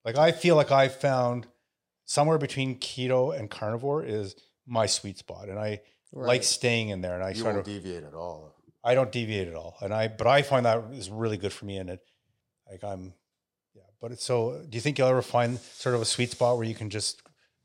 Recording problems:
none

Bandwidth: 16 kHz